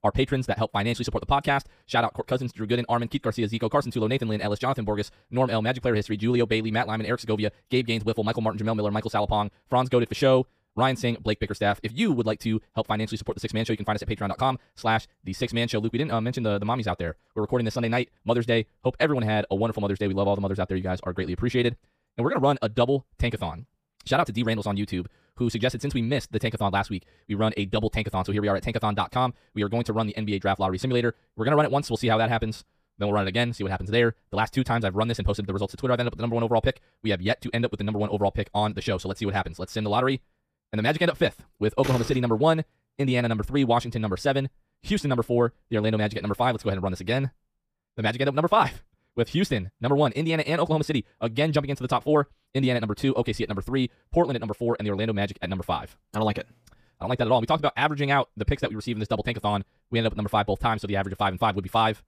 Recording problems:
wrong speed, natural pitch; too fast; 1.8 times normal speed

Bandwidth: 15 kHz